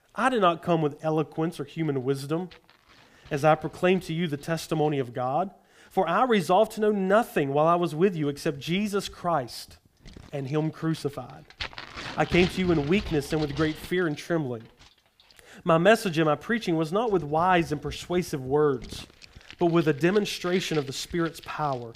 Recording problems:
household noises; noticeable; throughout; 15 dB below the speech

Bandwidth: 15 kHz